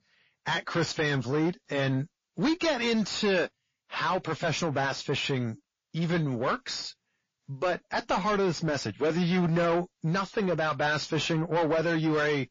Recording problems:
distortion; heavy; 6 dB below the speech
garbled, watery; slightly

